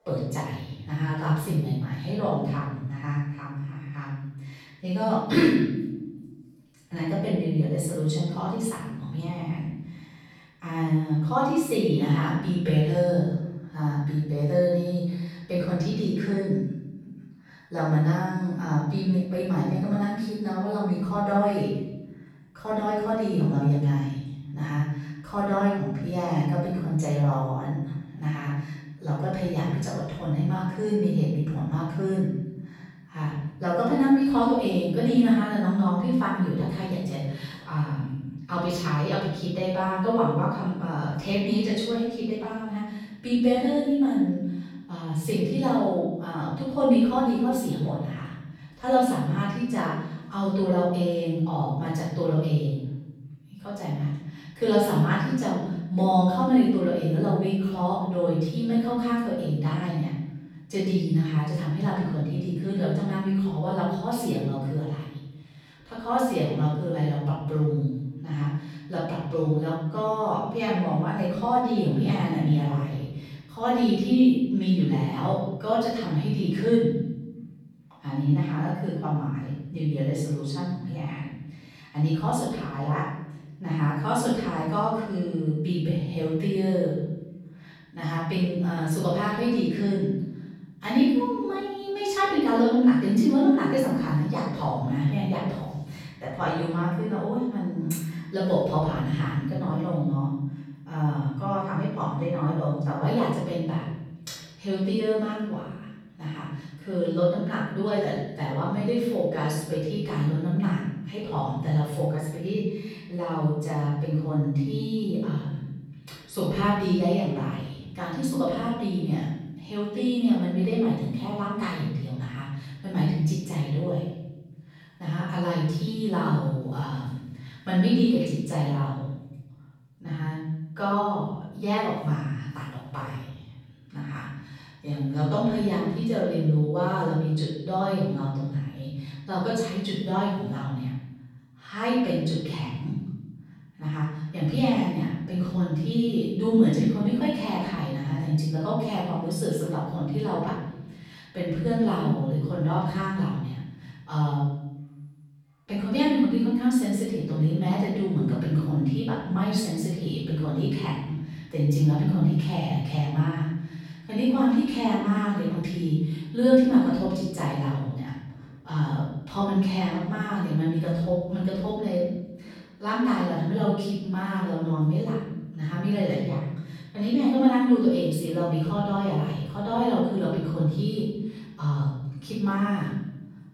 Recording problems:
room echo; strong; dies away in 1.1 s
off-mic speech; far

